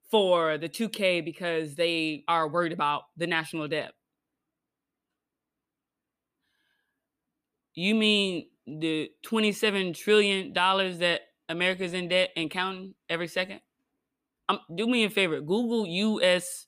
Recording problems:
none

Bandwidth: 15 kHz